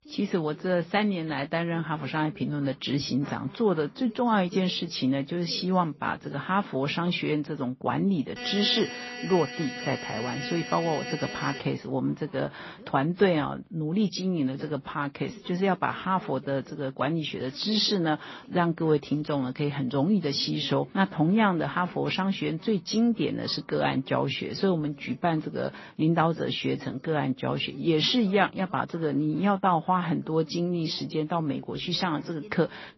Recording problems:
garbled, watery; slightly; nothing above 5.5 kHz
voice in the background; faint; throughout; 25 dB below the speech
alarm; noticeable; from 8.5 to 12 s; peak 9 dB below the speech

